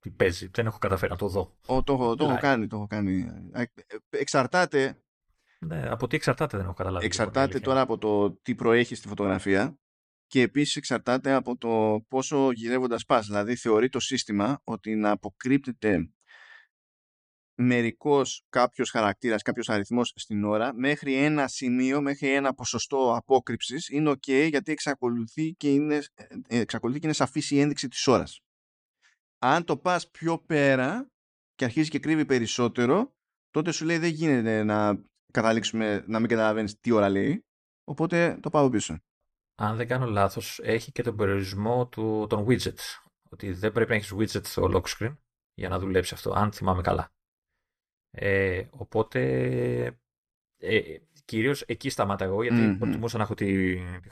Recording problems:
none

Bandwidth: 14.5 kHz